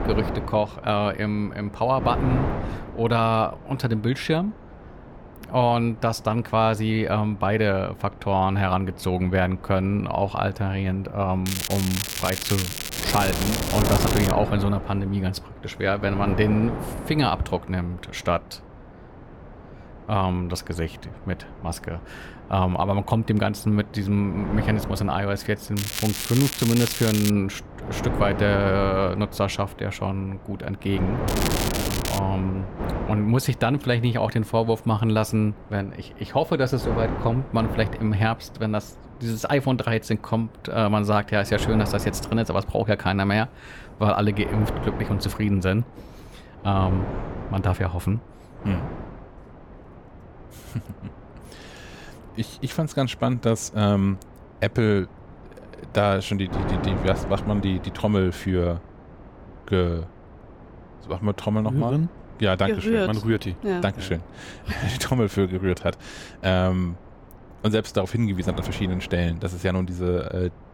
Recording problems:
crackling; loud; from 11 to 14 s, from 26 to 27 s and at 31 s; 4 dB below the speech
wind noise on the microphone; occasional gusts; 10 dB below the speech

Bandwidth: 17.5 kHz